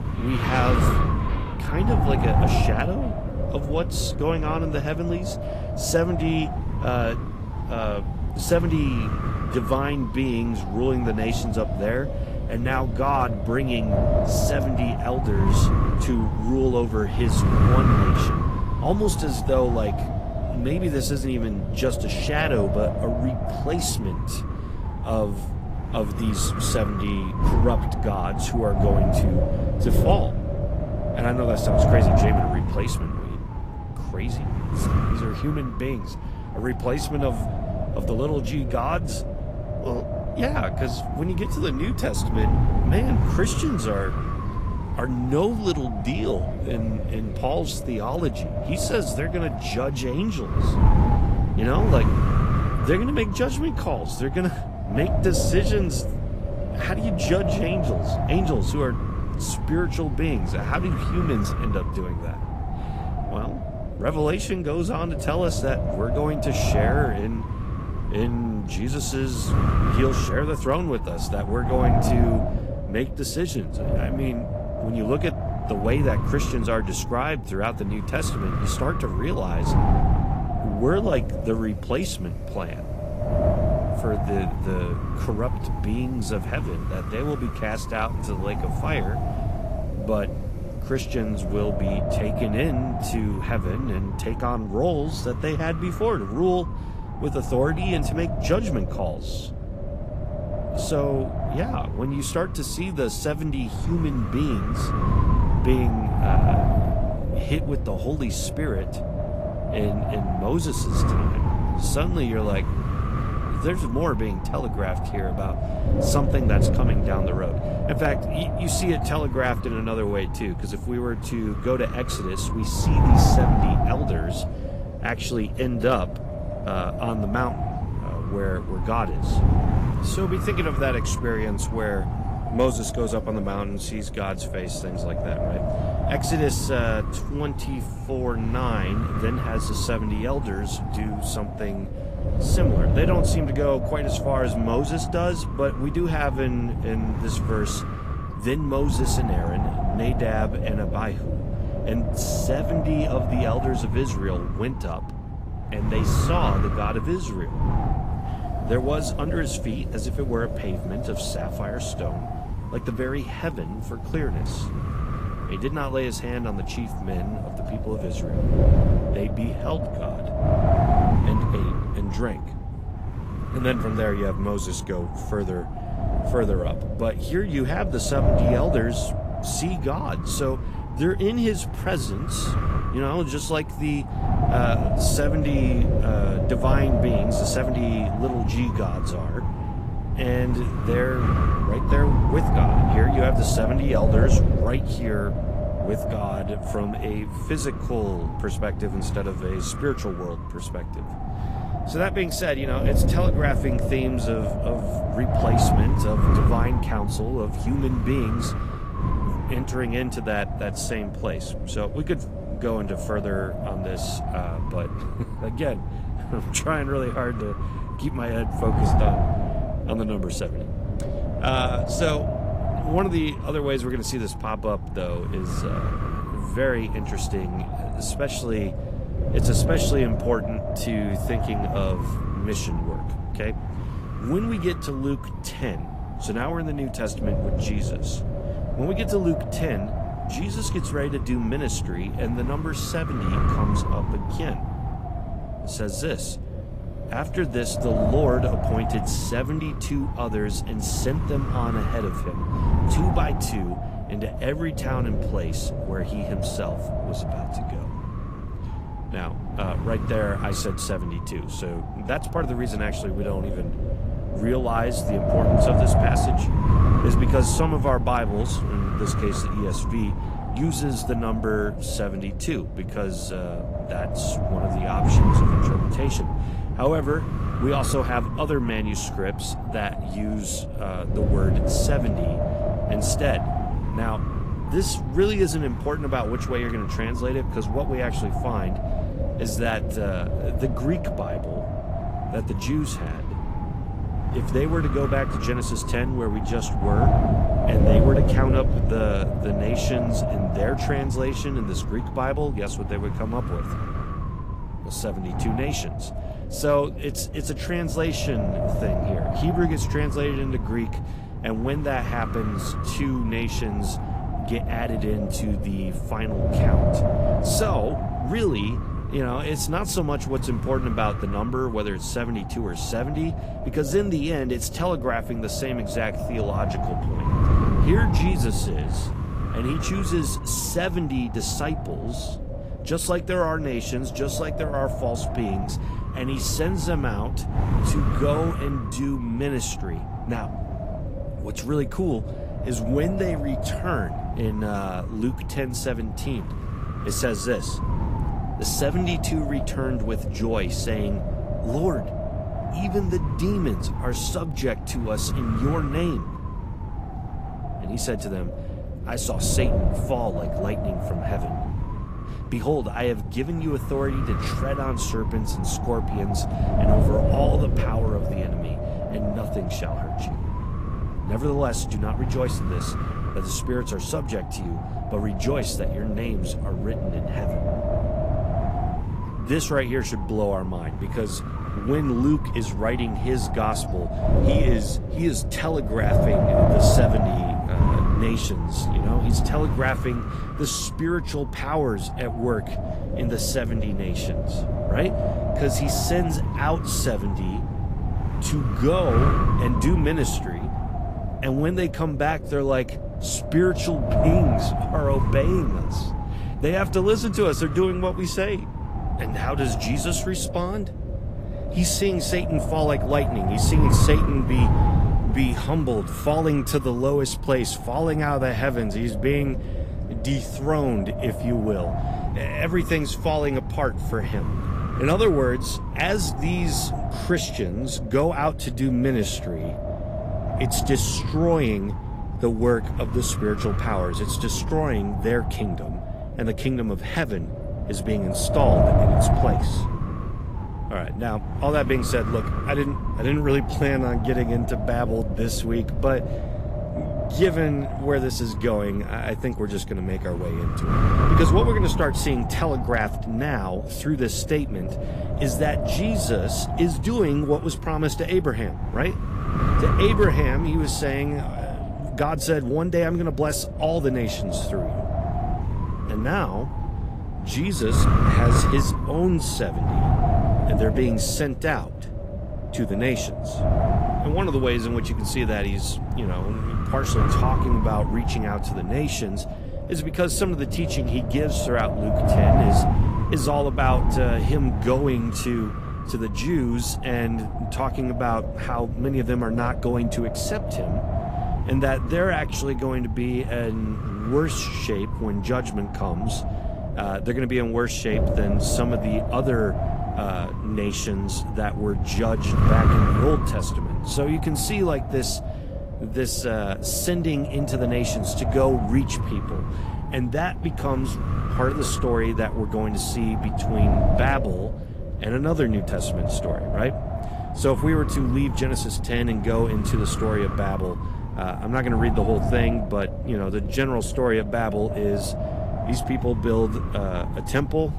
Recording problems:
garbled, watery; slightly; nothing above 14.5 kHz
wind noise on the microphone; heavy; 3 dB below the speech
rain or running water; faint; throughout; 25 dB below the speech

